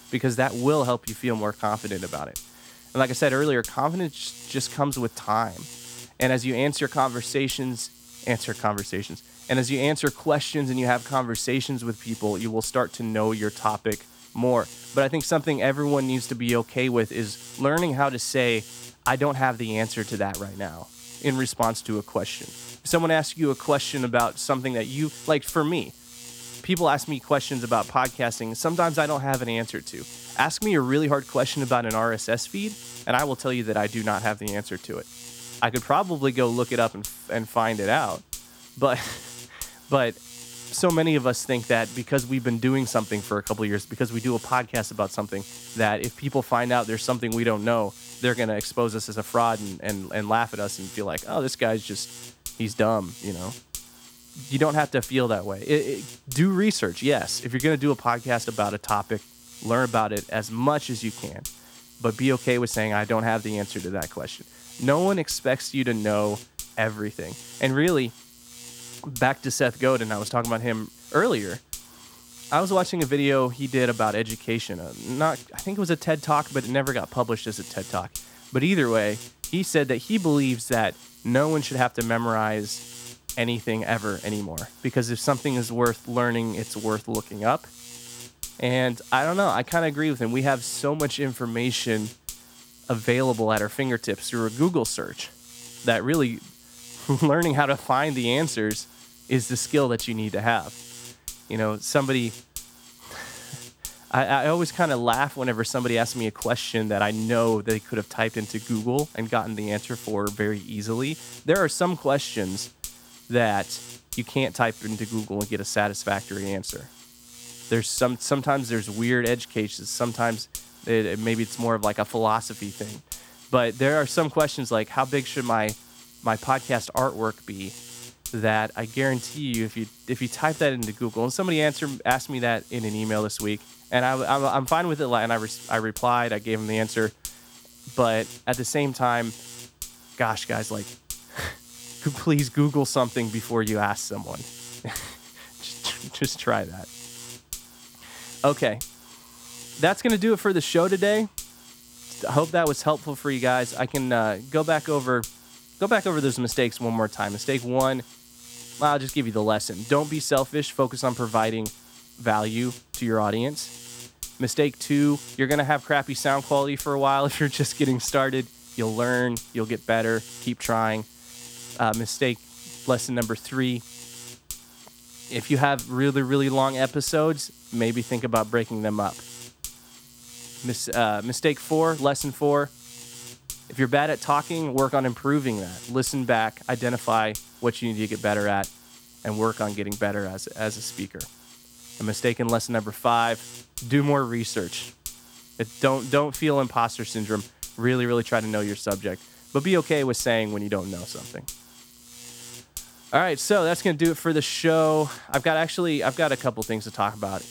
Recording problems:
electrical hum; noticeable; throughout; 60 Hz, 15 dB below the speech

